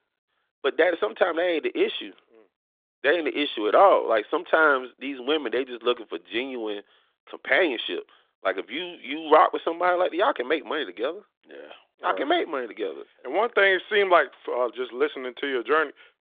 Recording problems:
phone-call audio; nothing above 3.5 kHz

